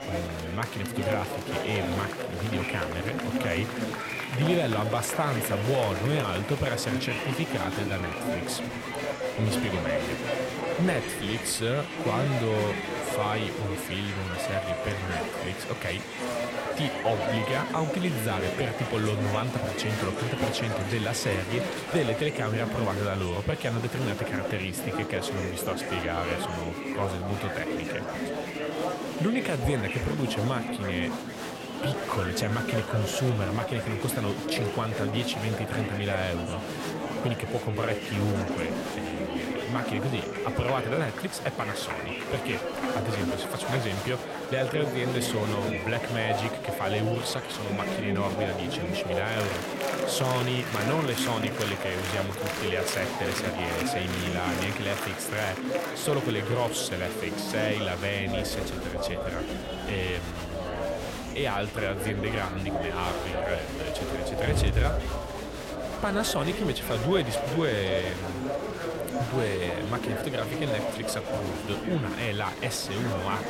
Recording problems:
murmuring crowd; loud; throughout; 1 dB below the speech

